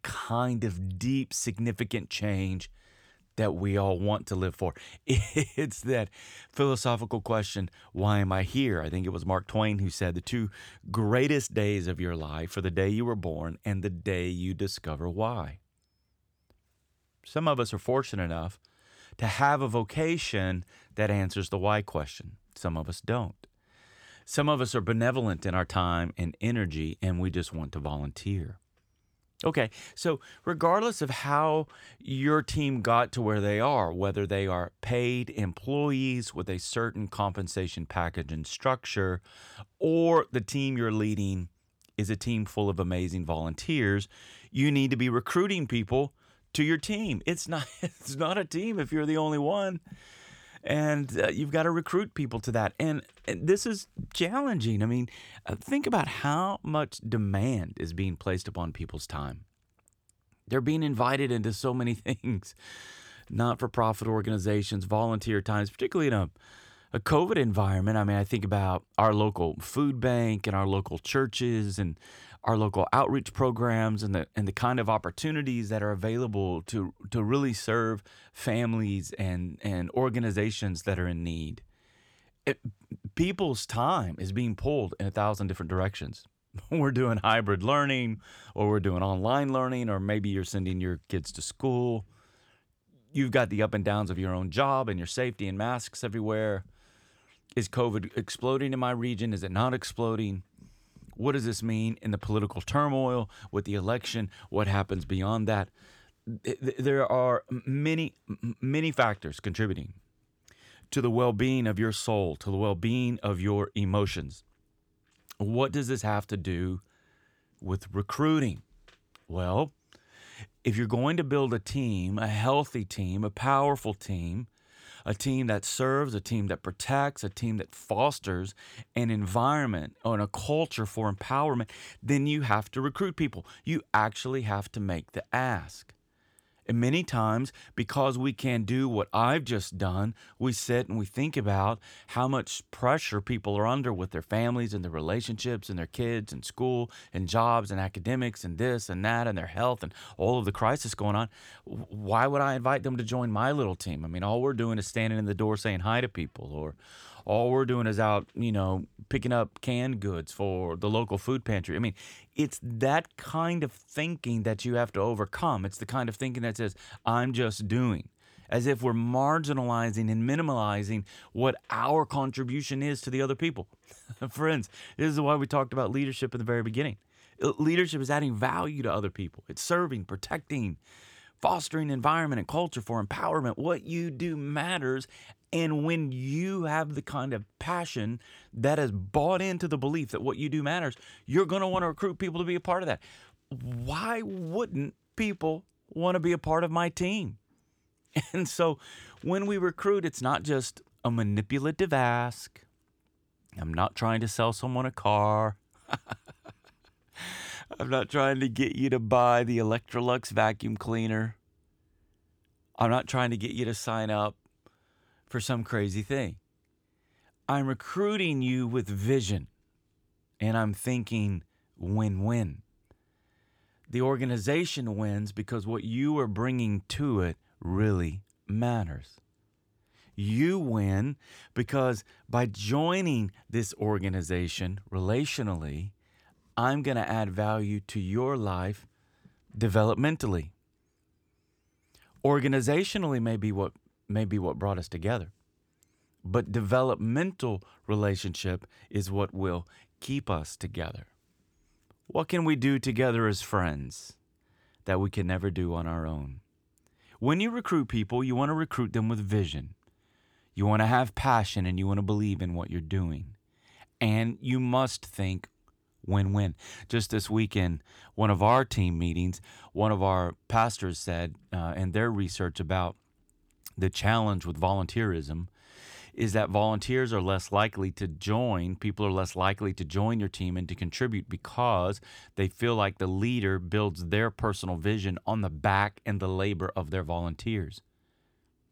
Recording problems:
none

